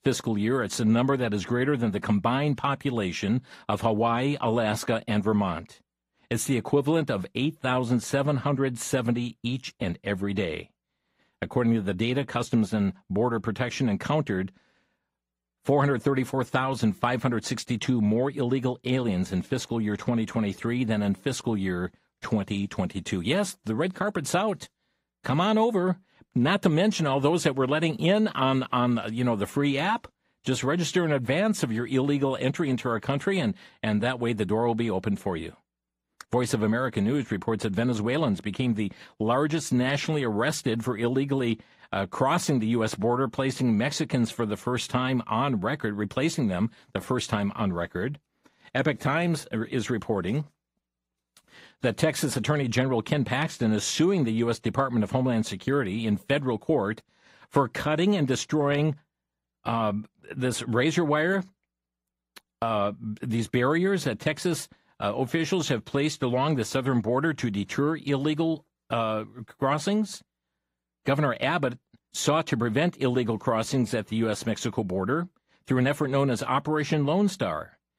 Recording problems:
garbled, watery; slightly; nothing above 15.5 kHz

